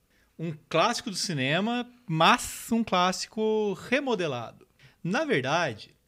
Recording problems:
none

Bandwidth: 15.5 kHz